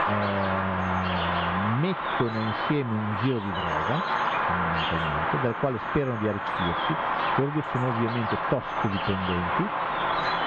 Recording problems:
muffled; slightly; fading above 3.5 kHz
squashed, flat; somewhat
animal sounds; very loud; throughout; 2 dB above the speech

